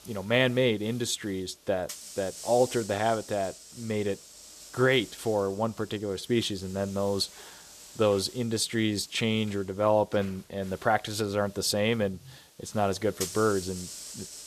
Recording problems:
hiss; noticeable; throughout; 15 dB below the speech

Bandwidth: 14 kHz